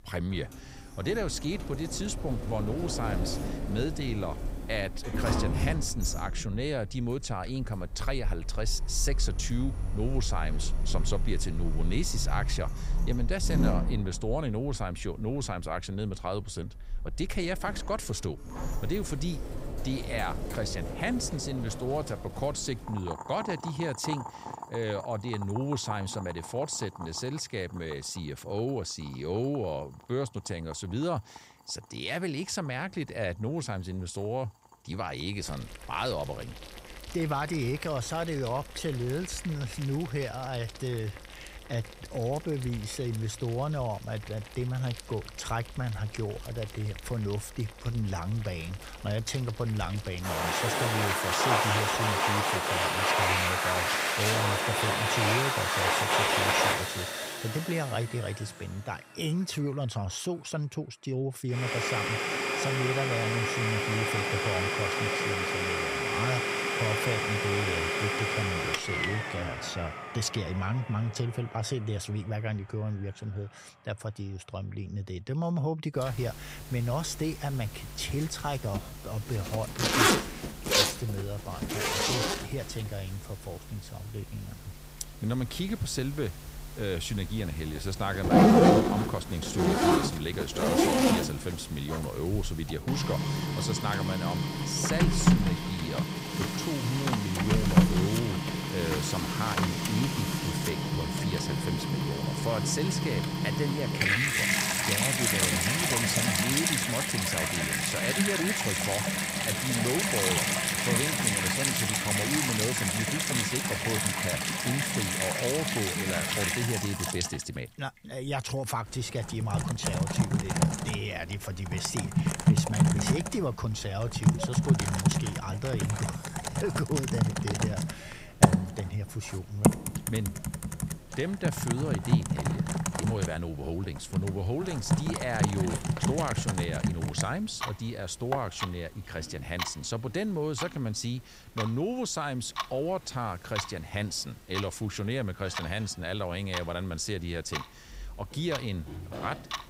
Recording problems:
household noises; very loud; throughout; 5 dB above the speech

